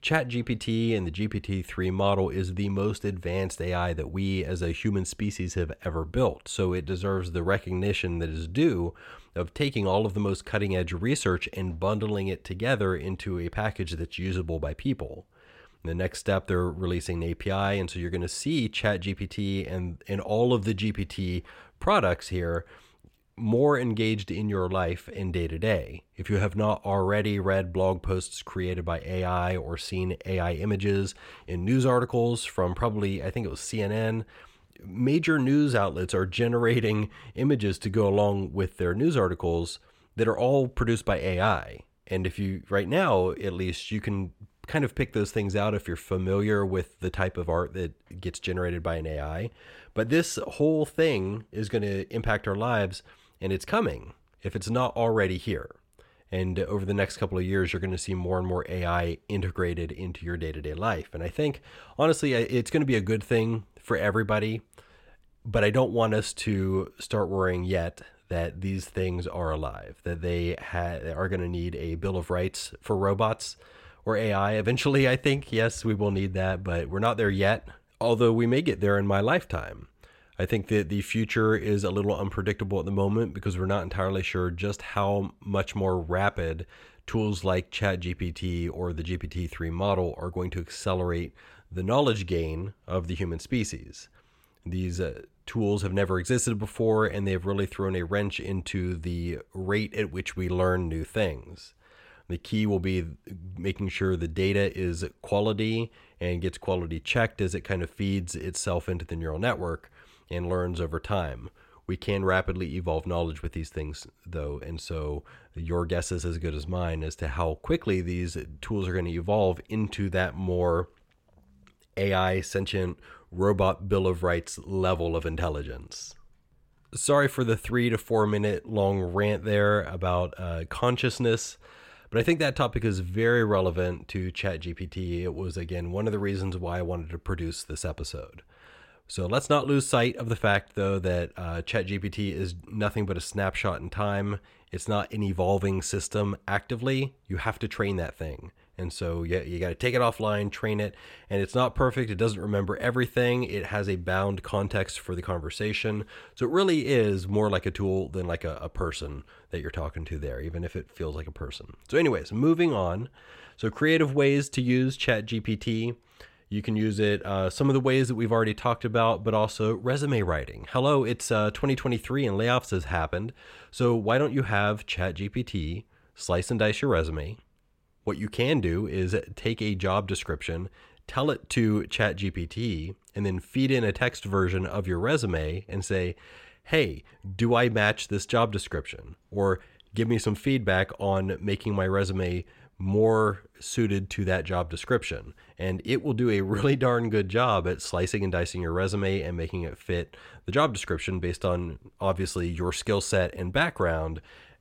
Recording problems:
none

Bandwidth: 16.5 kHz